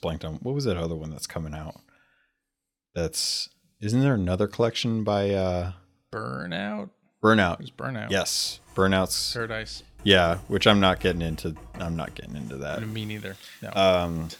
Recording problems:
household noises; faint; from 8.5 s on; 20 dB below the speech

